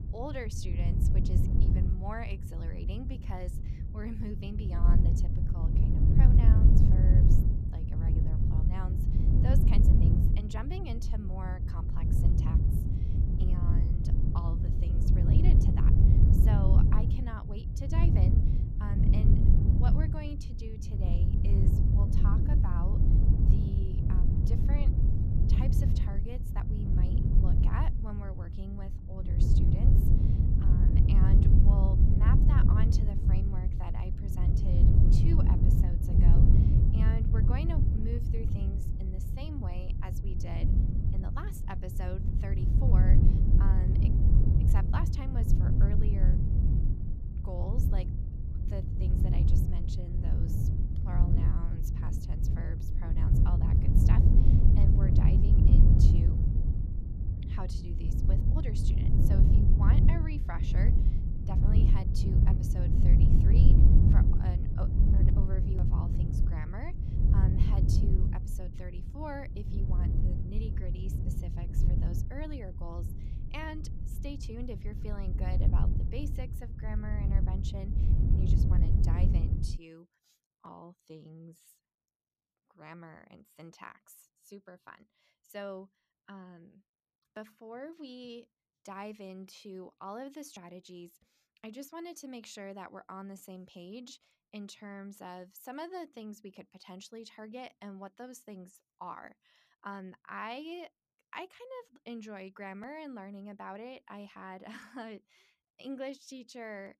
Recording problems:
wind noise on the microphone; heavy; until 1:20; 3 dB above the speech

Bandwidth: 14.5 kHz